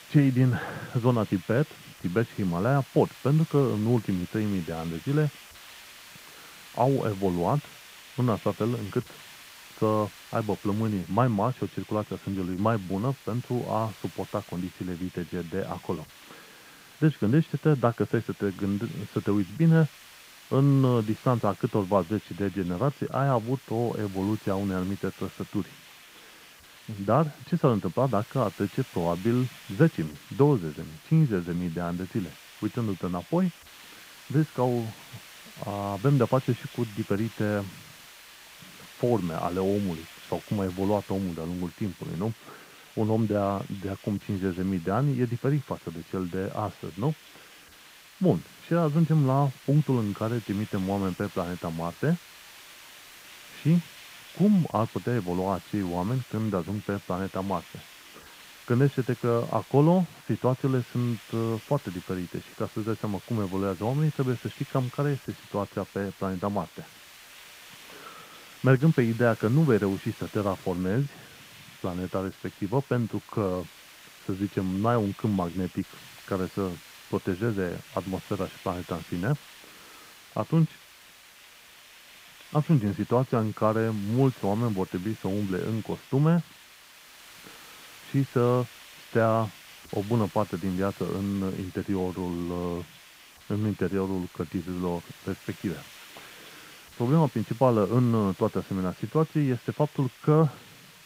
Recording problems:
muffled; very; fading above 1.5 kHz
hiss; noticeable; throughout; 20 dB below the speech

